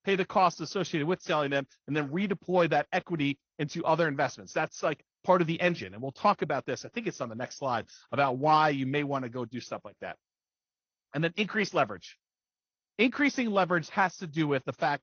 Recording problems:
garbled, watery; slightly; nothing above 6.5 kHz

